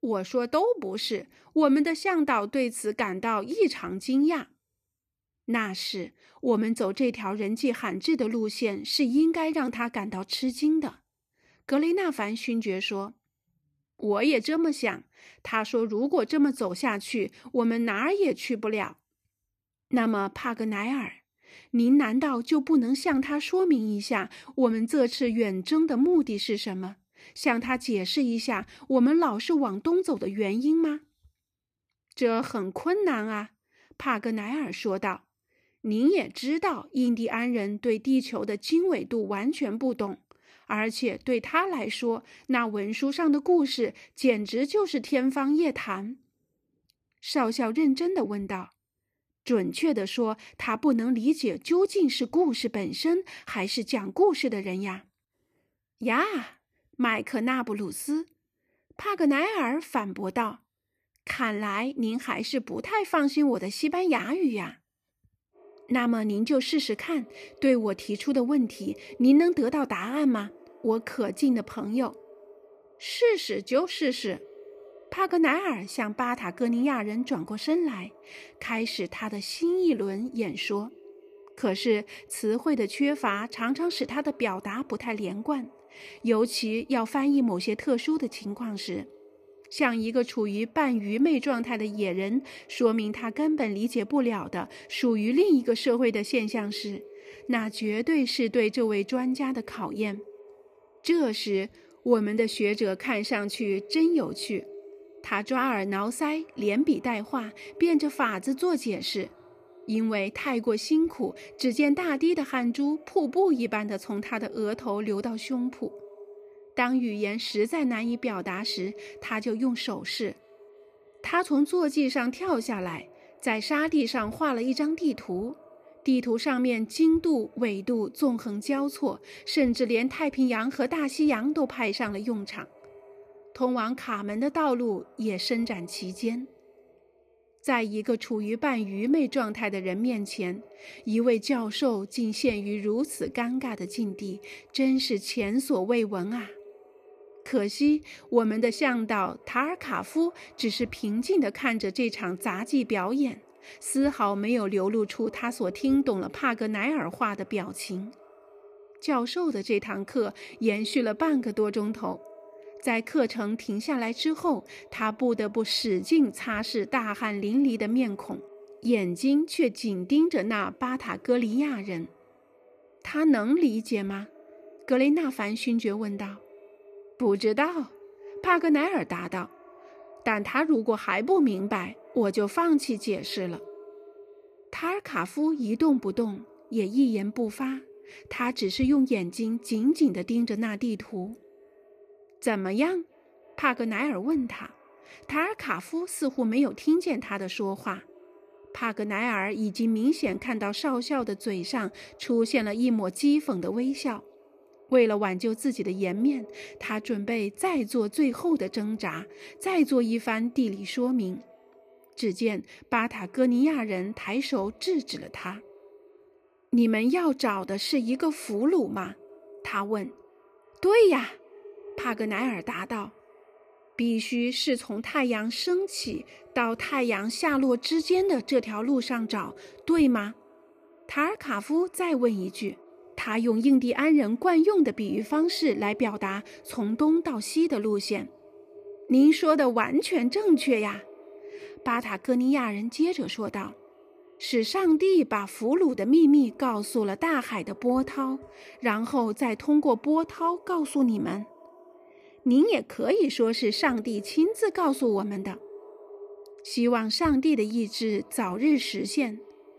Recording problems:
echo of what is said; faint; from 1:06 on; 310 ms later, 25 dB below the speech

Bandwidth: 14.5 kHz